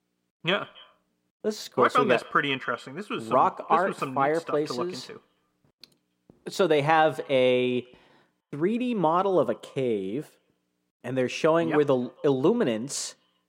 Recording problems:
echo of what is said; faint; throughout; 140 ms later, 25 dB below the speech

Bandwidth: 16 kHz